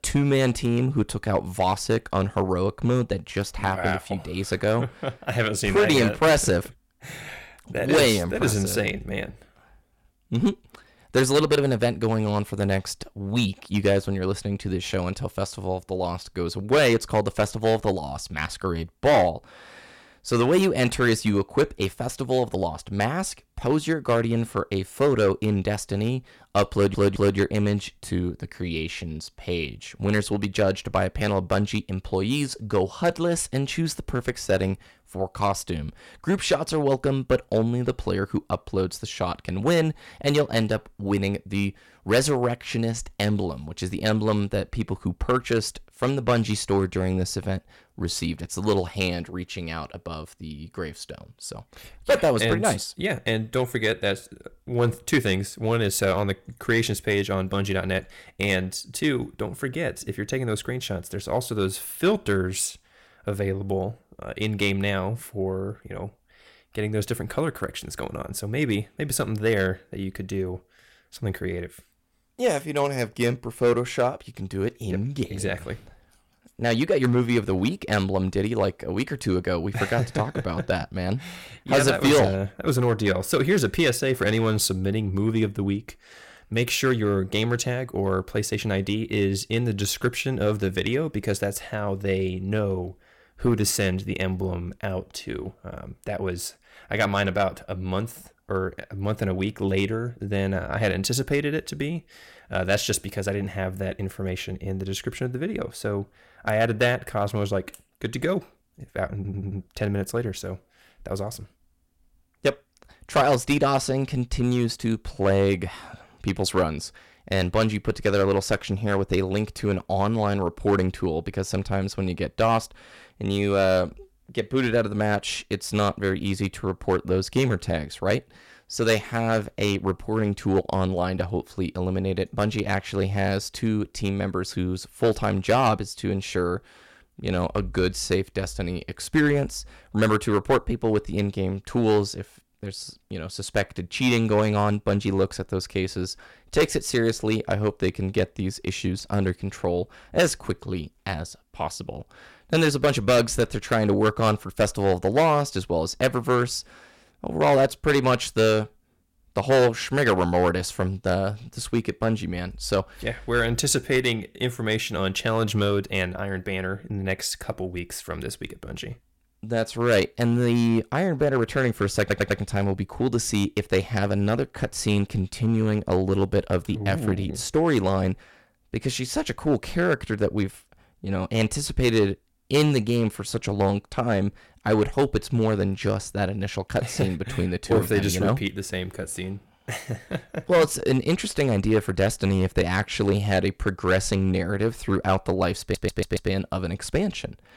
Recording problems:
distortion; slight; 2% of the sound clipped
audio stuttering; 4 times, first at 27 s

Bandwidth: 16.5 kHz